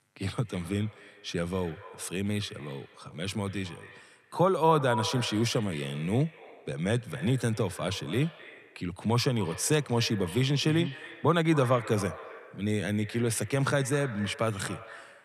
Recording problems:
echo of what is said; noticeable; throughout; 260 ms later, 15 dB below the speech

